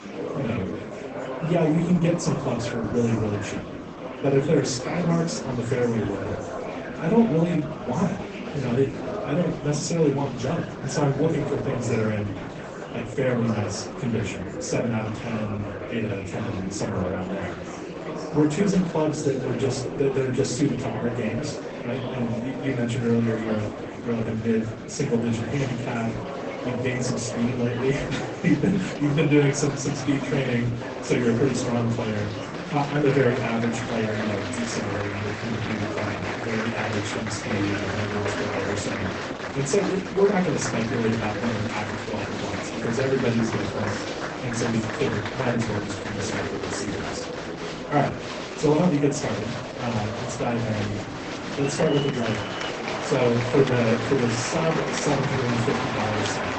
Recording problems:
off-mic speech; far
garbled, watery; badly; nothing above 8 kHz
room echo; very slight; dies away in 0.3 s
murmuring crowd; loud; throughout; 6 dB below the speech

